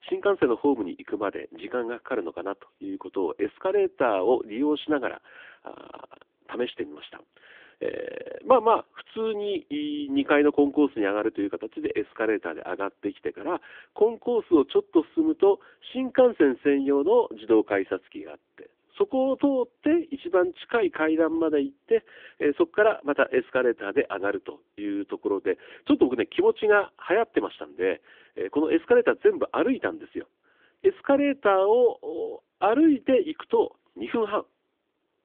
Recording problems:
phone-call audio; nothing above 3.5 kHz

